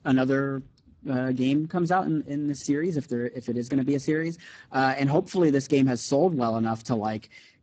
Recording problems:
garbled, watery; badly; nothing above 8 kHz

